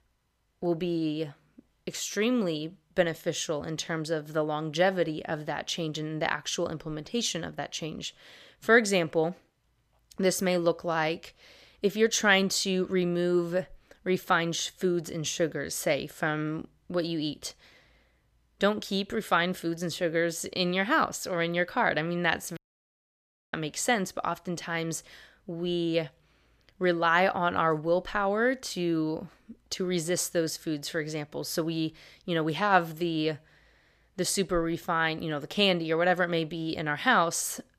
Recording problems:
audio cutting out; at 23 s for 1 s

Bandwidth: 14.5 kHz